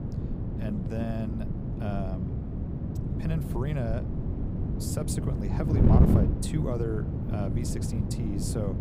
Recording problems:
wind noise on the microphone; heavy; as loud as the speech

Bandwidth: 15.5 kHz